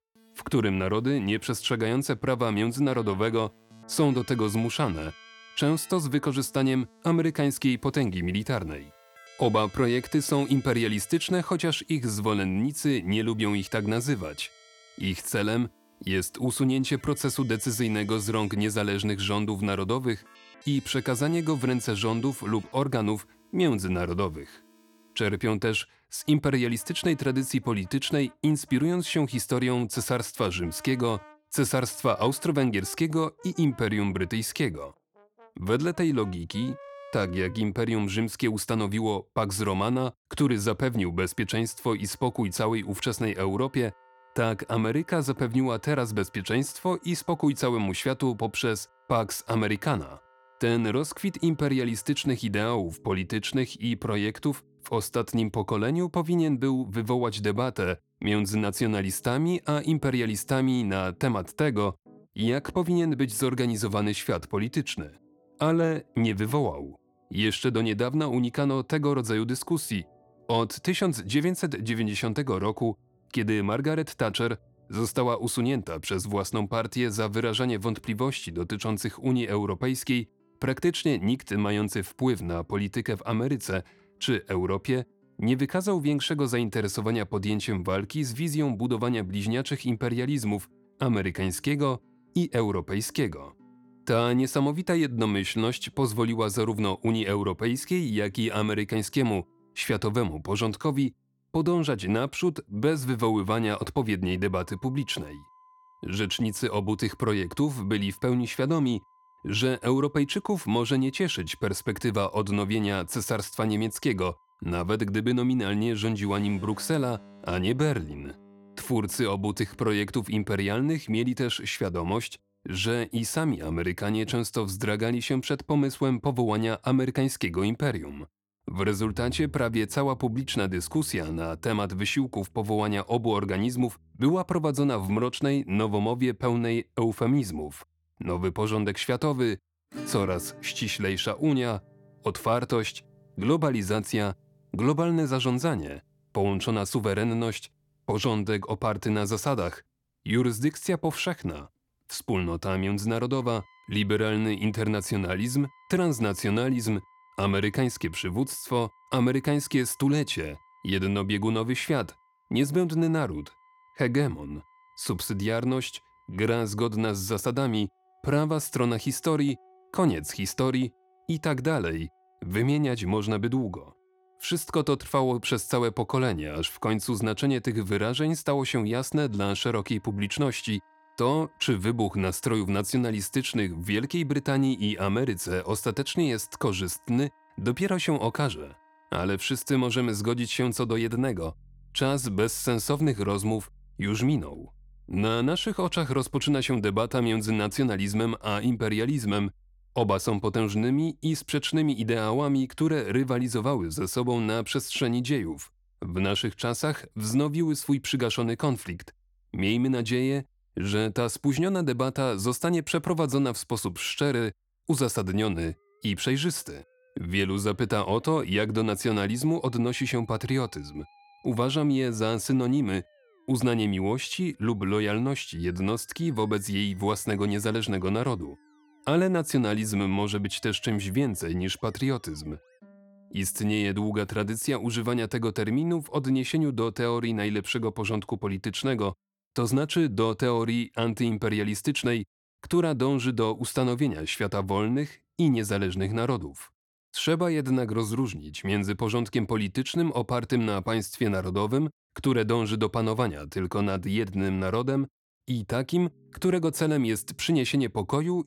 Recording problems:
background music; faint; throughout; 30 dB below the speech

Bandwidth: 17 kHz